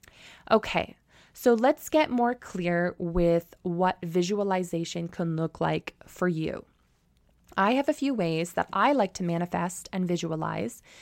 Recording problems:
none

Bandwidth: 16 kHz